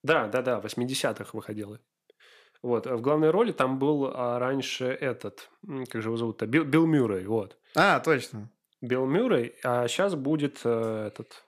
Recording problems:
none

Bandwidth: 14.5 kHz